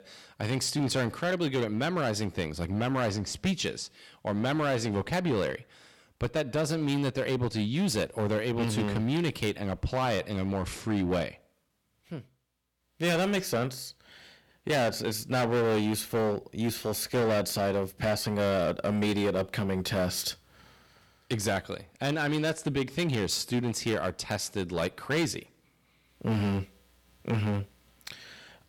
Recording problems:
distortion; heavy; 11% of the sound clipped

